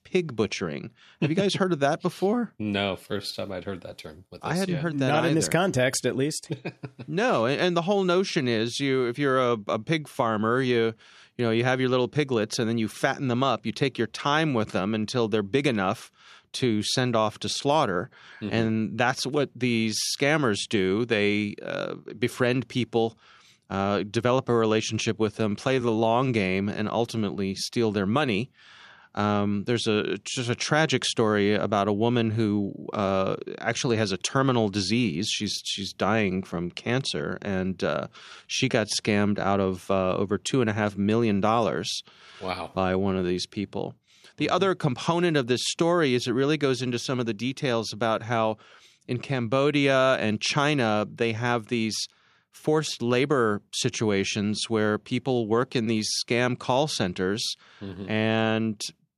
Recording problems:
uneven, jittery; strongly; from 1 to 50 s

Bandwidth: 14.5 kHz